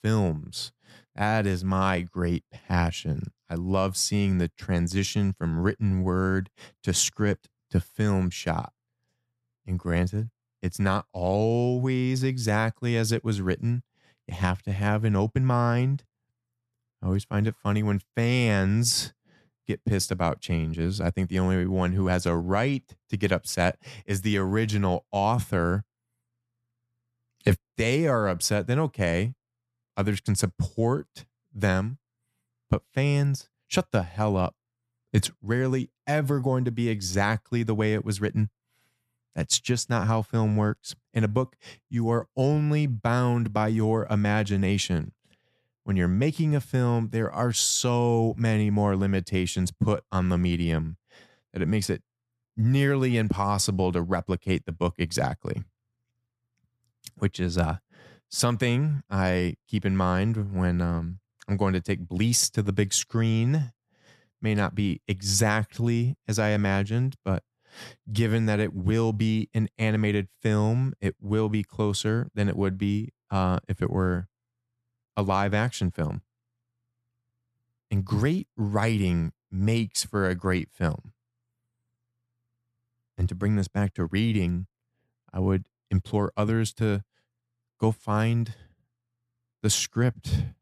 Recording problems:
none

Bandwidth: 13.5 kHz